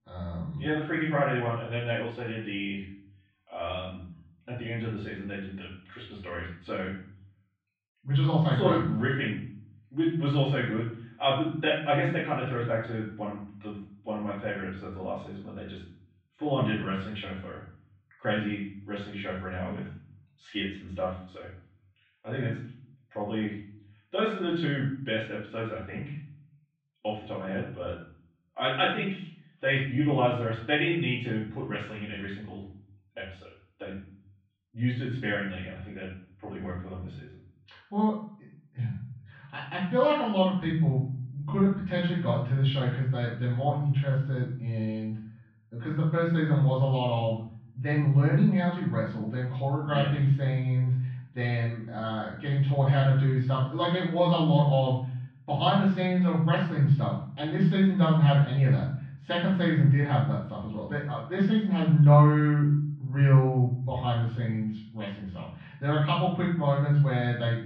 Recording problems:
off-mic speech; far
muffled; very; fading above 3.5 kHz
room echo; noticeable; dies away in 0.5 s

